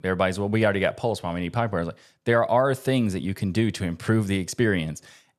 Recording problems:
none

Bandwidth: 13.5 kHz